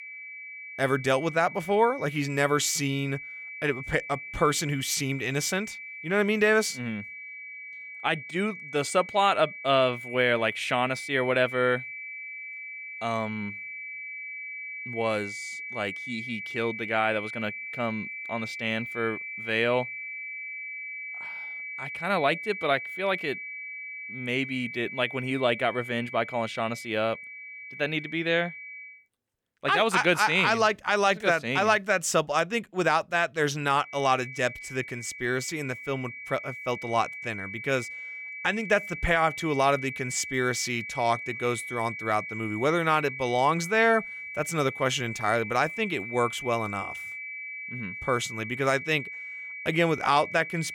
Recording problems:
high-pitched whine; loud; until 29 s and from 34 s on; 2.5 kHz, 9 dB below the speech

